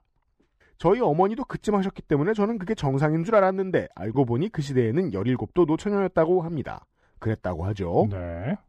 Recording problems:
muffled; slightly; fading above 2.5 kHz

